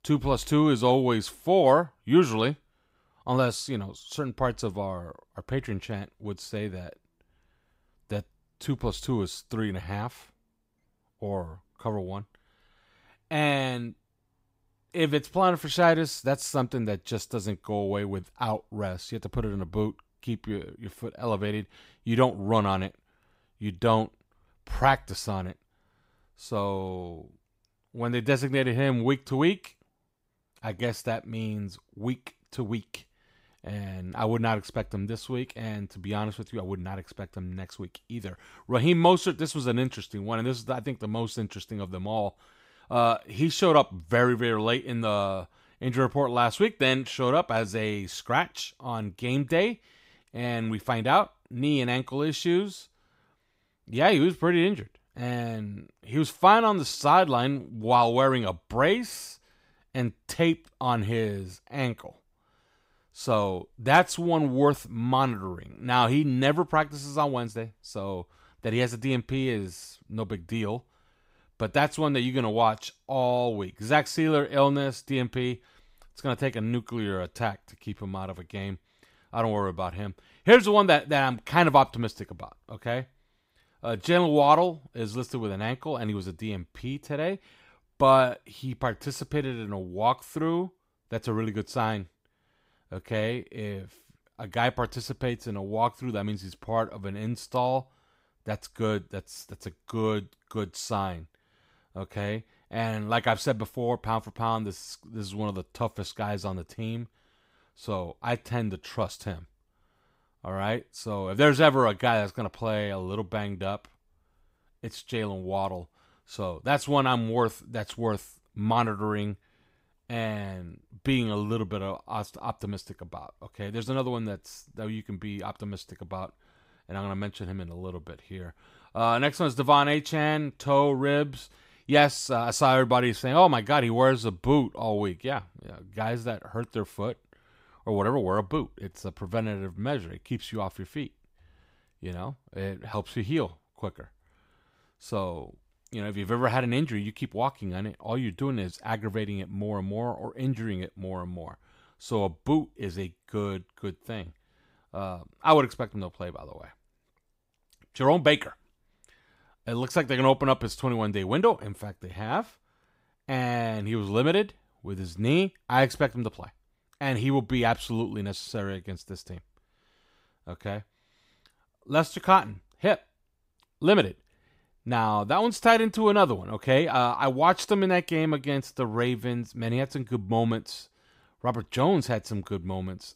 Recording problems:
none

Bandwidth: 15.5 kHz